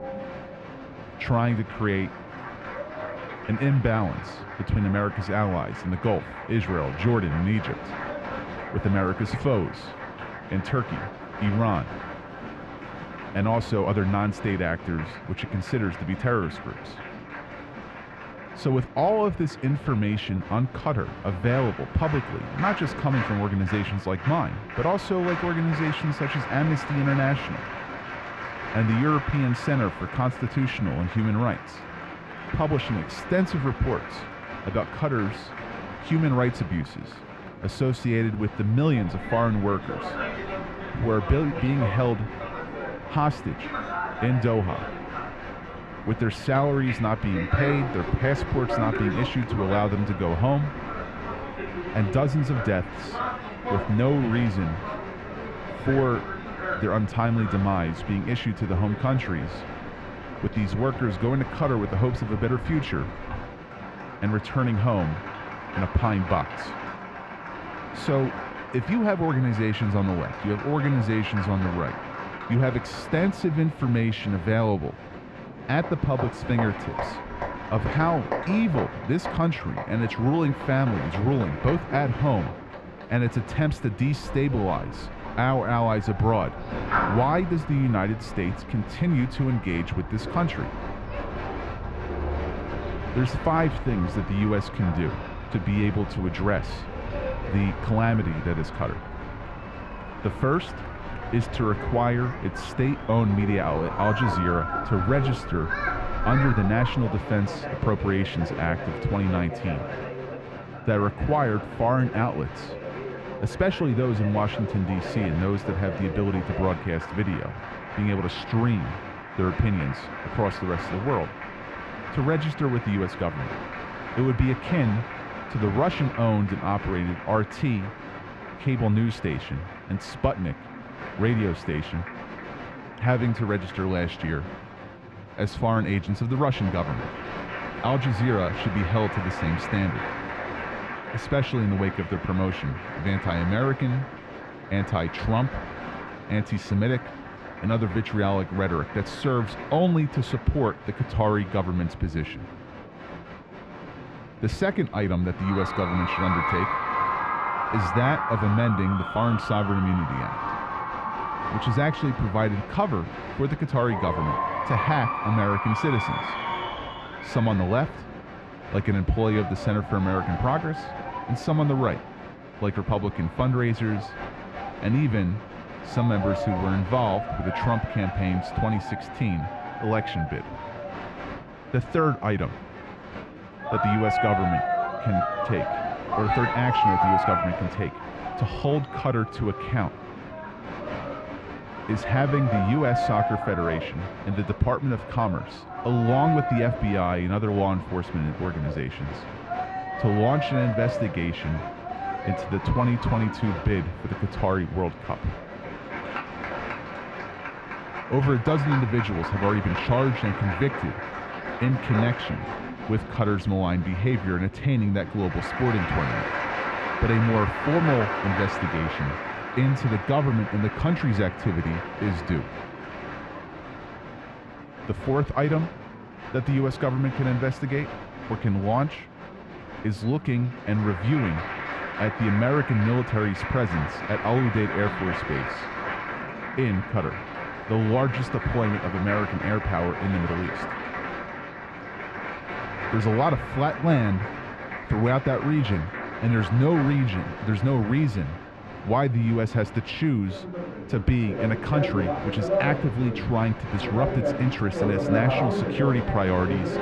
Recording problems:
muffled; very; fading above 4 kHz
crowd noise; loud; throughout; 7 dB below the speech
murmuring crowd; noticeable; throughout; 20 dB below the speech

